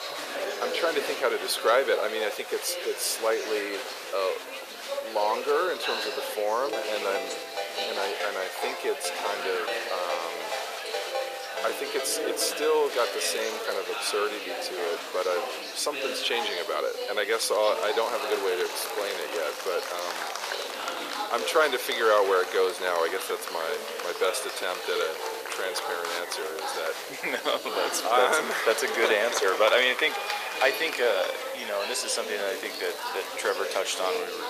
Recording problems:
thin; very; fading below 450 Hz
chatter from many people; loud; throughout; 5 dB below the speech
hiss; noticeable; throughout; 20 dB below the speech
crackling; noticeable; at 13 s, from 18 to 20 s and at 32 s; 20 dB below the speech
phone ringing; noticeable; from 6.5 to 13 s; peak 6 dB below the speech

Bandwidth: 14.5 kHz